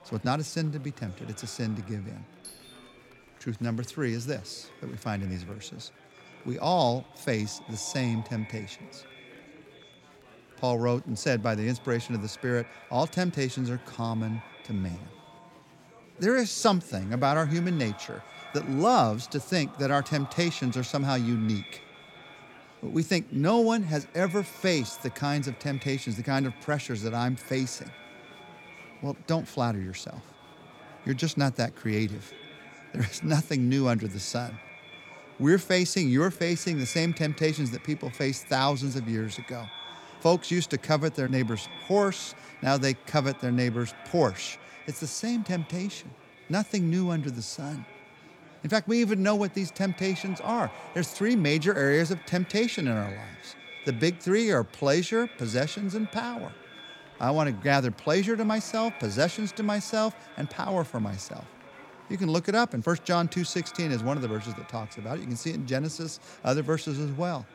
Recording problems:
echo of what is said; faint; throughout; 330 ms later, 20 dB below the speech
murmuring crowd; faint; throughout; 25 dB below the speech
doorbell; faint; at 2.5 s; peak 15 dB below the speech

